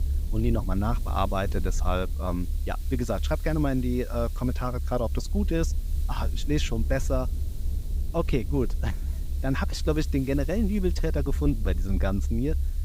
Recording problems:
low rumble; noticeable; throughout; 20 dB below the speech
hiss; faint; throughout; 20 dB below the speech

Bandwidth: 15.5 kHz